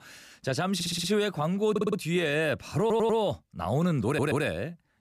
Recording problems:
audio stuttering; 4 times, first at 1 s

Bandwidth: 14.5 kHz